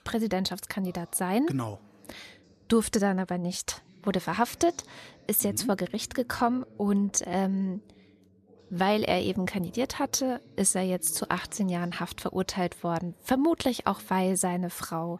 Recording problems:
voice in the background; faint; throughout; 25 dB below the speech

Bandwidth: 13.5 kHz